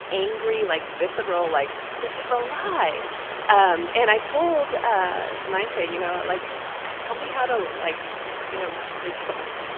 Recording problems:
phone-call audio; nothing above 3 kHz
hiss; loud; throughout; 7 dB below the speech

